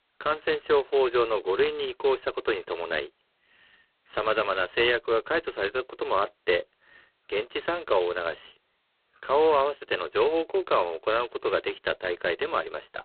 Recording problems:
phone-call audio; poor line; nothing above 4 kHz

